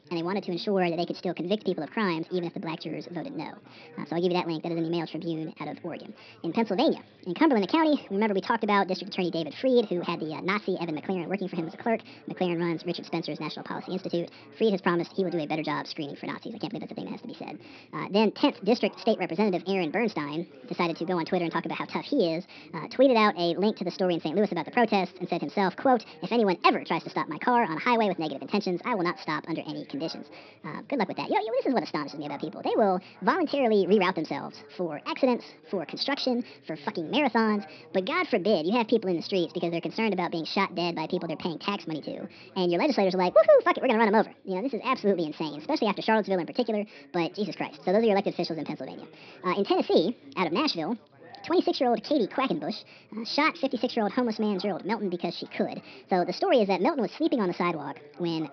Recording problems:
wrong speed and pitch; too fast and too high; 1.5 times normal speed
high frequencies cut off; noticeable; nothing above 5.5 kHz
background chatter; faint; throughout; 4 voices, 25 dB below the speech

